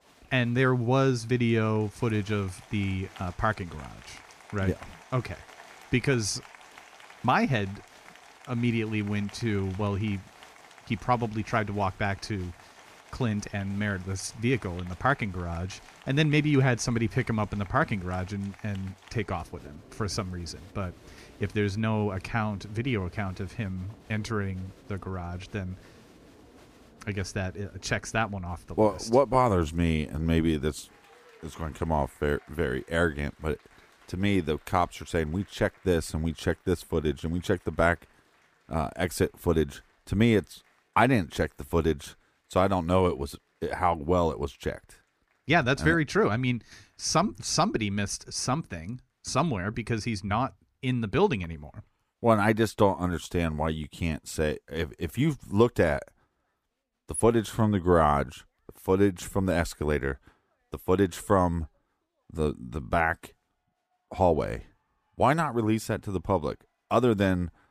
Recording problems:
crowd noise; faint; throughout; 25 dB below the speech

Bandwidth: 15 kHz